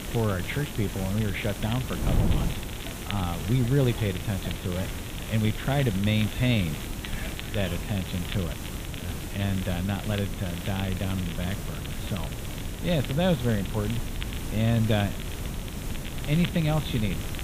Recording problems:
high frequencies cut off; severe; nothing above 4 kHz
wind noise on the microphone; occasional gusts; 15 dB below the speech
hiss; noticeable; throughout; 10 dB below the speech
crackle, like an old record; noticeable; 15 dB below the speech
animal sounds; faint; until 8 s; 20 dB below the speech

